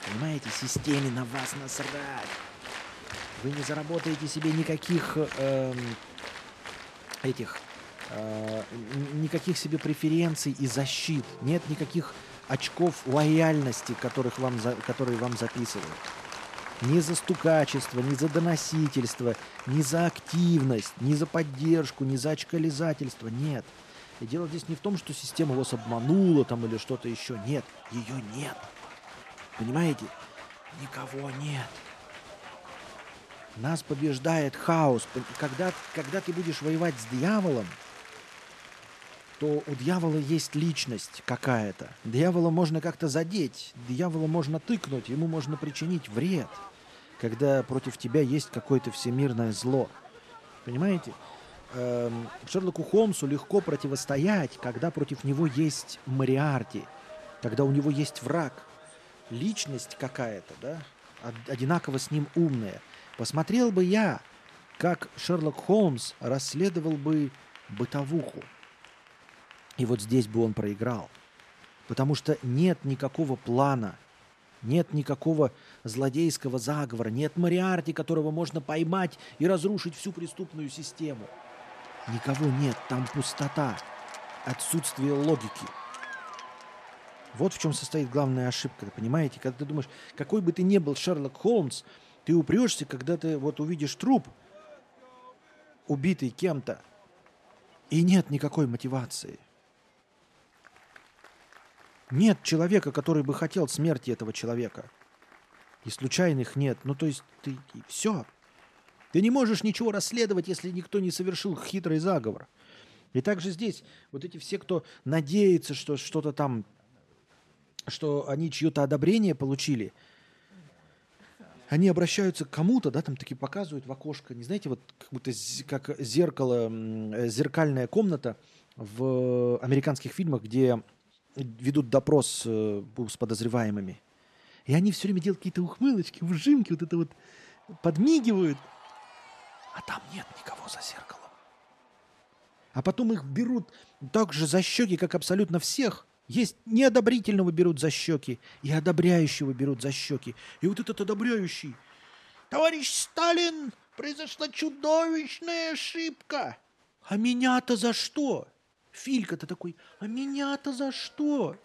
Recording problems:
crowd noise; noticeable; throughout; 15 dB below the speech

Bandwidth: 13.5 kHz